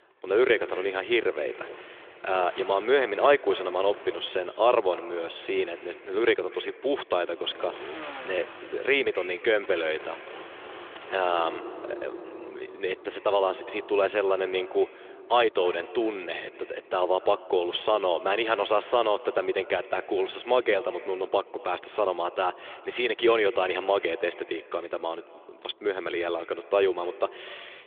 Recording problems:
echo of what is said; faint; throughout; 240 ms later, 20 dB below the speech
phone-call audio; nothing above 3.5 kHz
traffic noise; noticeable; throughout; 20 dB below the speech

